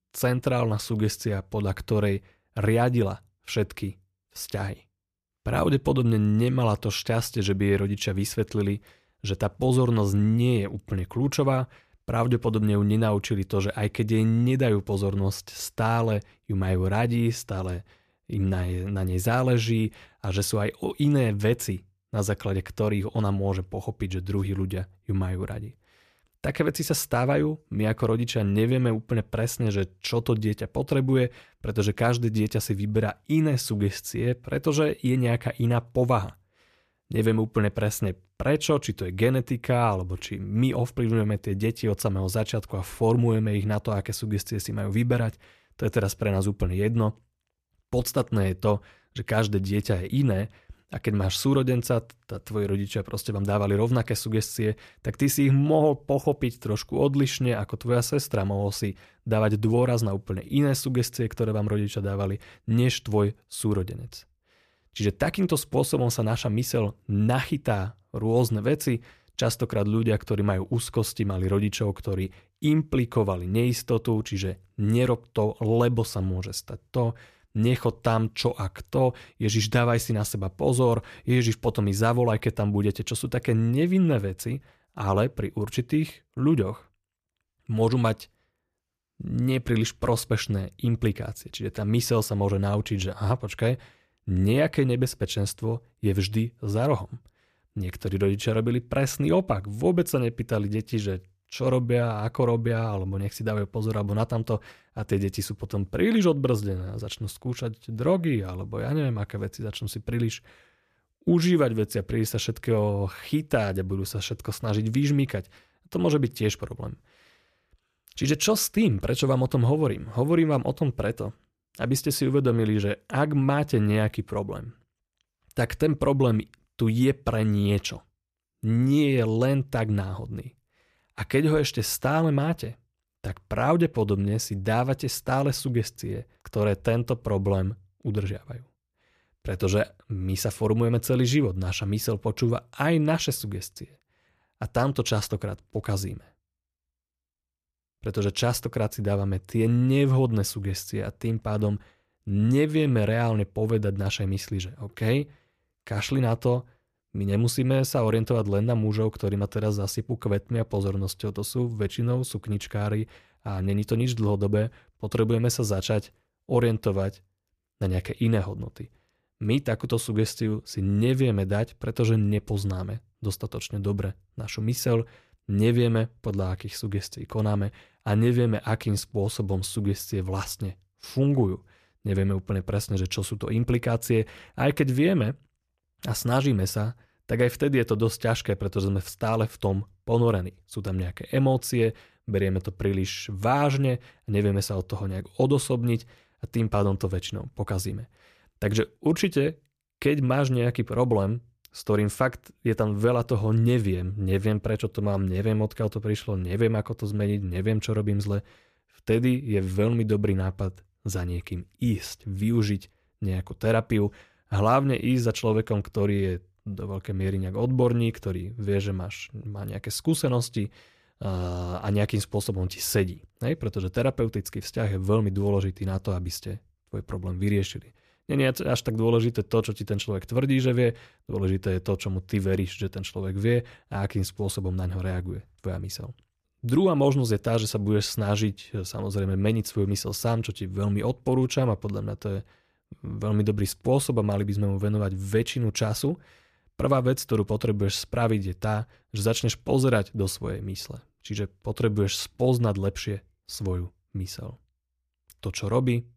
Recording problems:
none

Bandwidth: 14.5 kHz